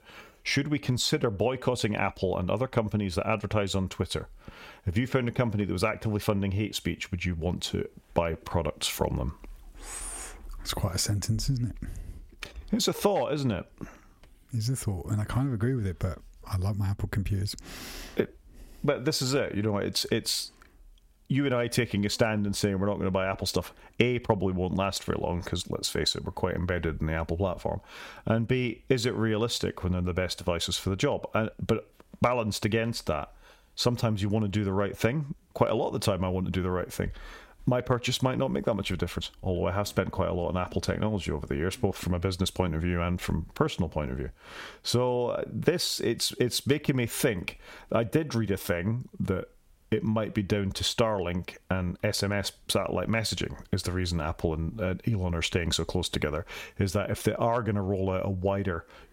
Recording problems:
squashed, flat; heavily

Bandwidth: 16 kHz